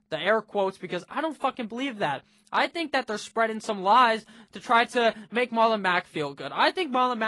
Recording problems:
garbled, watery; slightly; nothing above 10.5 kHz
abrupt cut into speech; at the end

